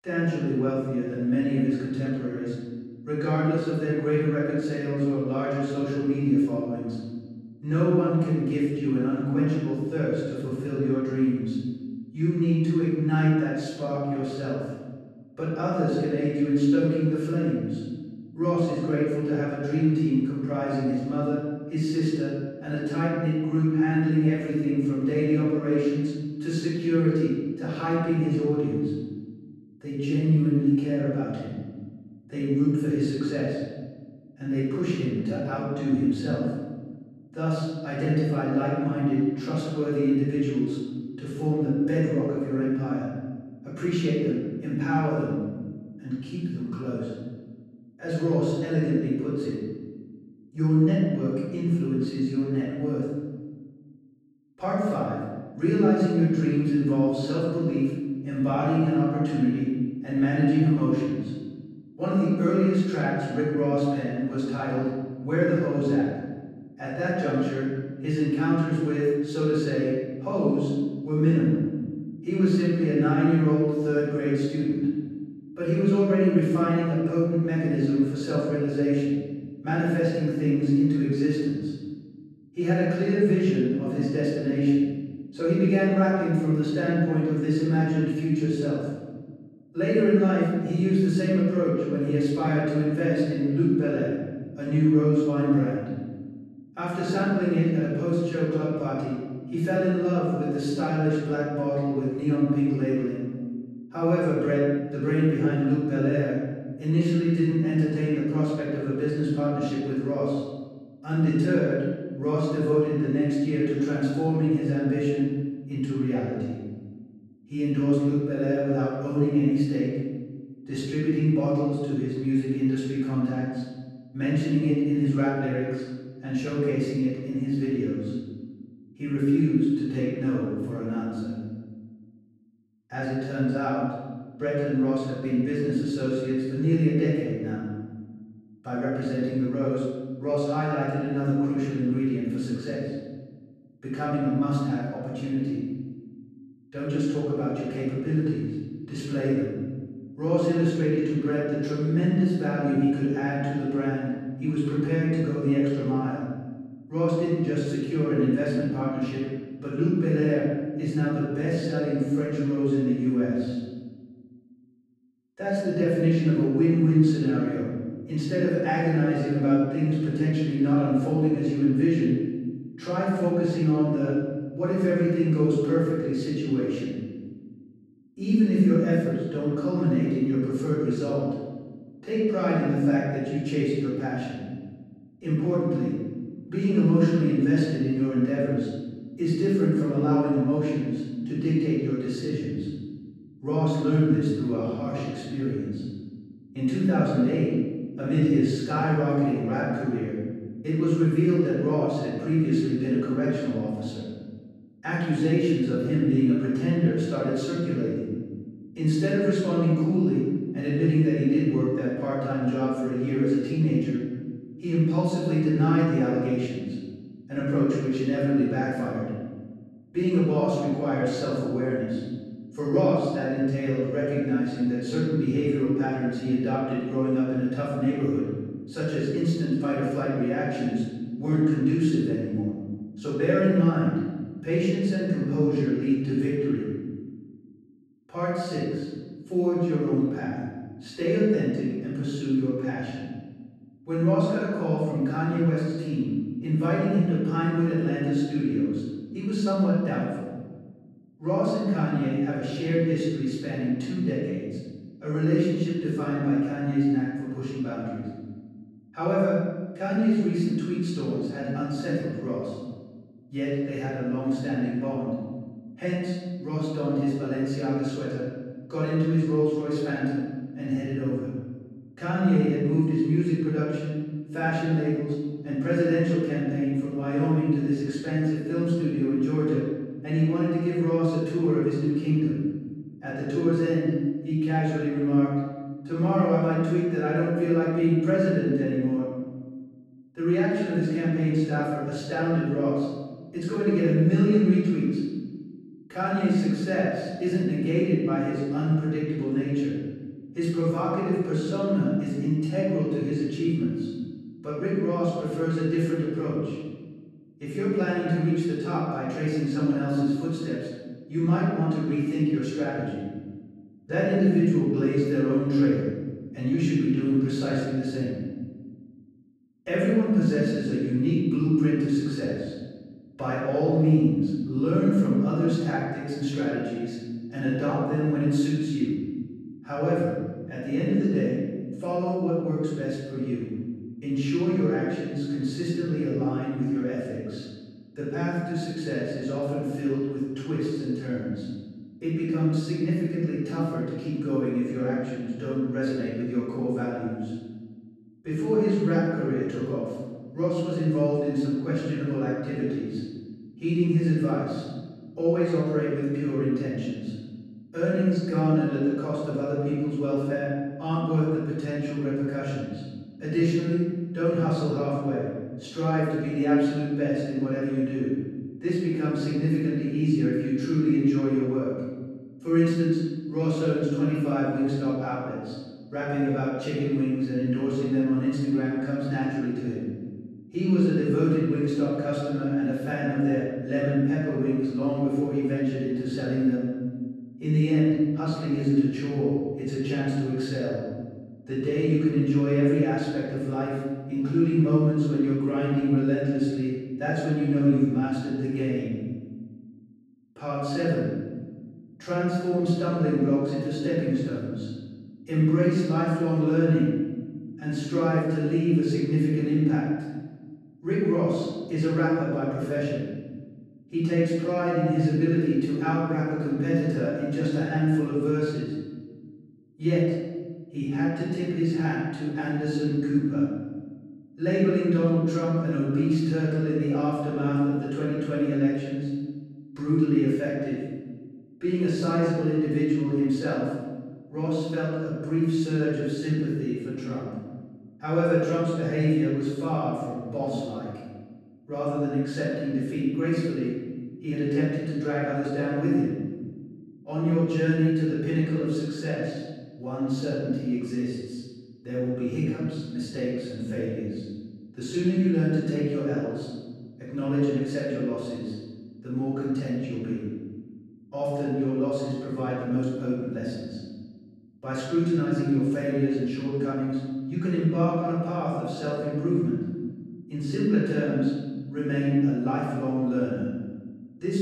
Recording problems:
room echo; strong; dies away in 1.4 s
off-mic speech; far

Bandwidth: 13.5 kHz